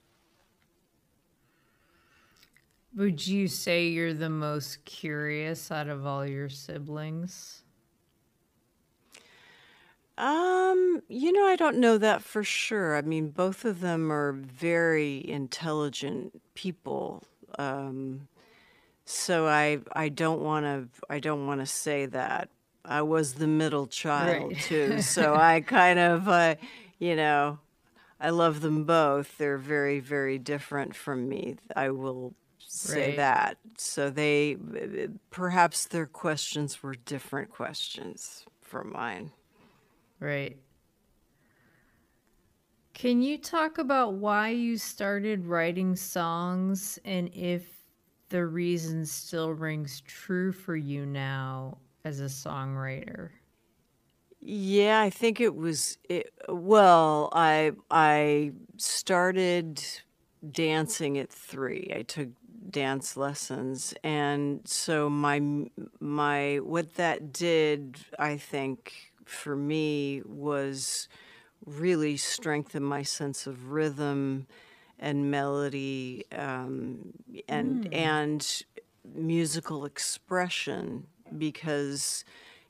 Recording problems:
wrong speed, natural pitch; too slow; 0.6 times normal speed

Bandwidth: 15 kHz